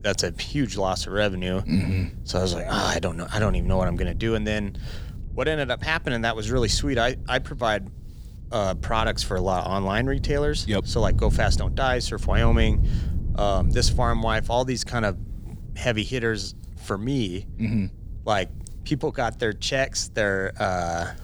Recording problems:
wind noise on the microphone; occasional gusts; 20 dB below the speech

